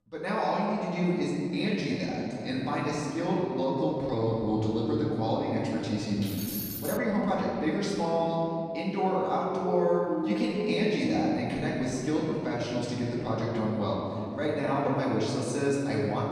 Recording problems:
off-mic speech; far
room echo; noticeable; dies away in 2.6 s
uneven, jittery; strongly; from 1.5 to 15 s
jangling keys; noticeable; at 6 s; peak 5 dB below the speech
siren; noticeable; from 9.5 to 11 s; peak 3 dB below the speech

